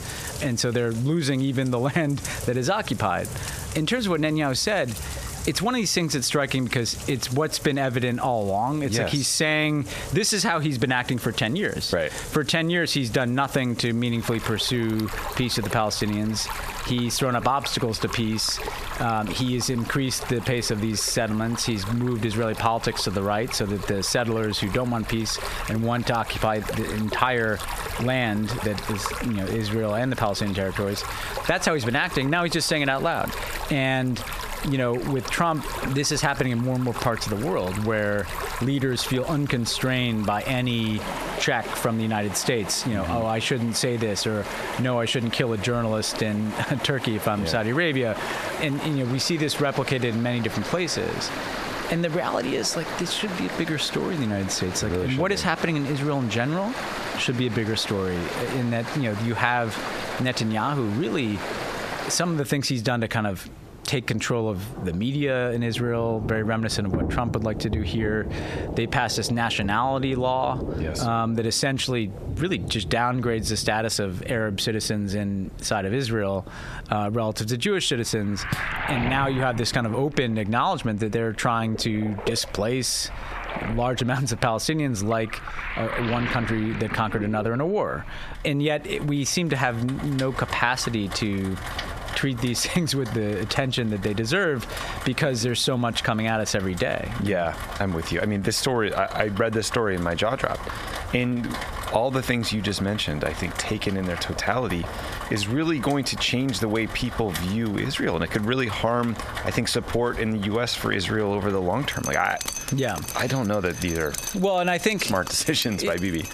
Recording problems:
squashed, flat; heavily, background pumping
rain or running water; noticeable; throughout; 10 dB below the speech
door banging; noticeable; at 1:19; peak 8 dB below the speech

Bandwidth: 14.5 kHz